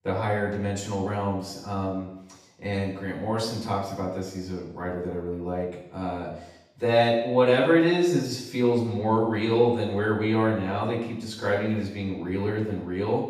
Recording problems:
off-mic speech; far
room echo; noticeable; dies away in 0.8 s

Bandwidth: 14.5 kHz